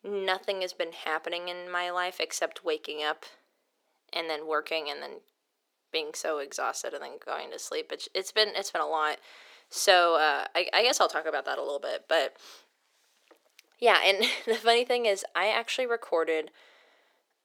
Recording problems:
thin; very; fading below 400 Hz

